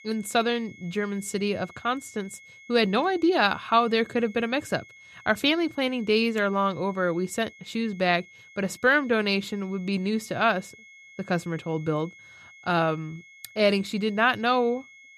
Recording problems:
high-pitched whine; faint; throughout; 2 kHz, 25 dB below the speech

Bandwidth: 14.5 kHz